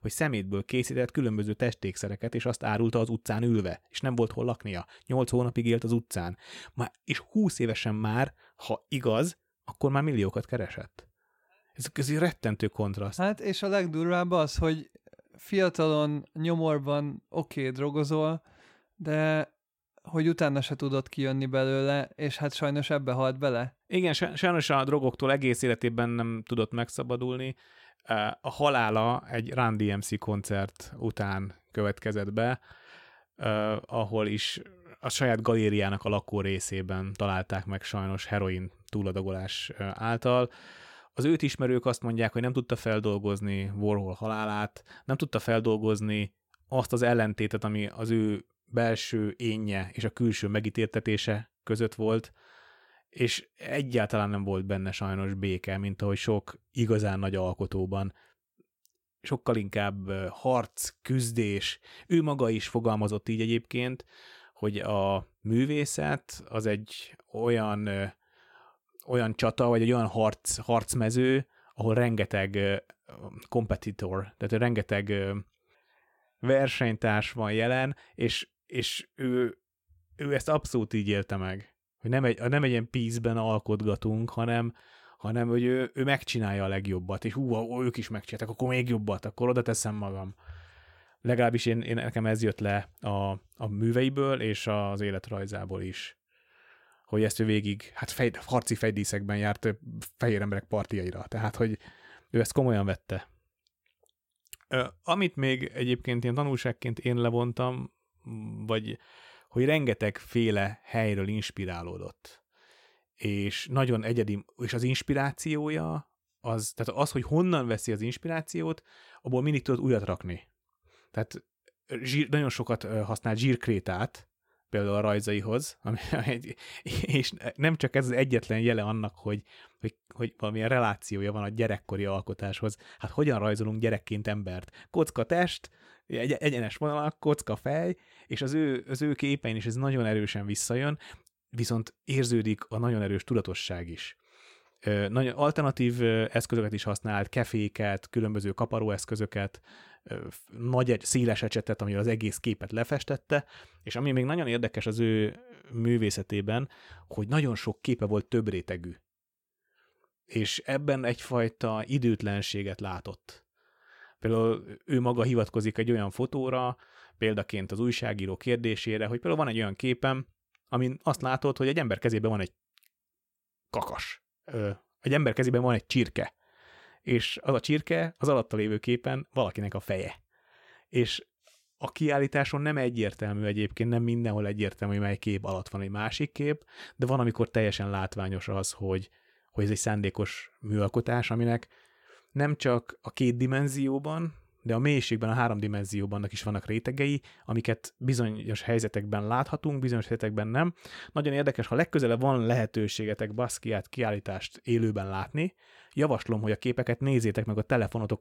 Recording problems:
none

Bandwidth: 16.5 kHz